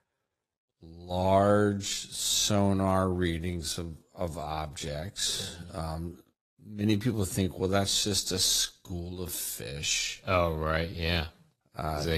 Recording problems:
wrong speed, natural pitch; too slow; 0.7 times normal speed
garbled, watery; slightly; nothing above 14 kHz
abrupt cut into speech; at the end

